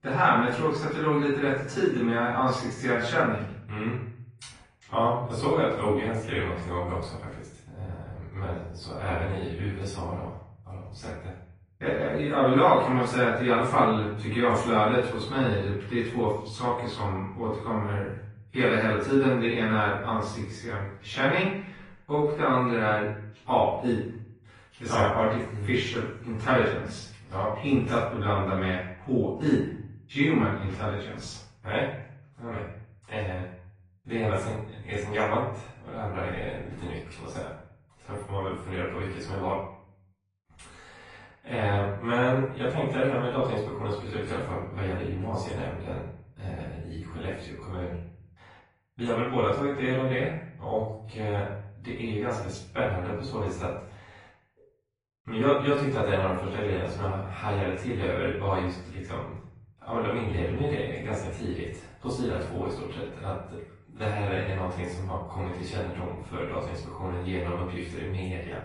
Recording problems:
off-mic speech; far
room echo; noticeable; dies away in 0.6 s
garbled, watery; slightly; nothing above 10.5 kHz

